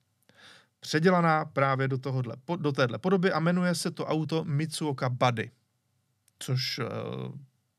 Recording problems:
none

